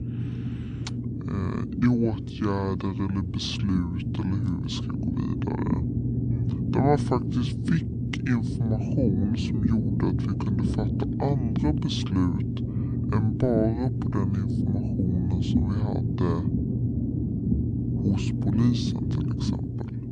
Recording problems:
wrong speed and pitch; too slow and too low; 0.6 times normal speed
low rumble; loud; throughout; 3 dB below the speech

